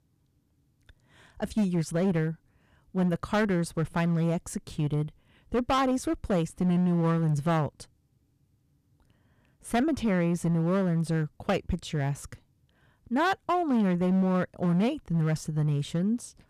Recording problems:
distortion; slight; 8% of the sound clipped

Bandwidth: 14.5 kHz